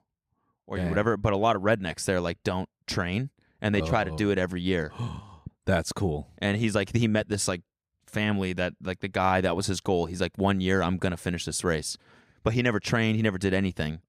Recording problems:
none

